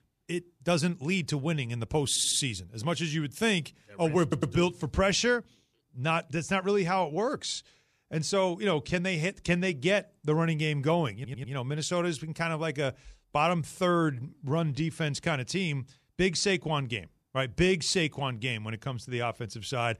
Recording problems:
audio stuttering; at 2 s, at 4 s and at 11 s

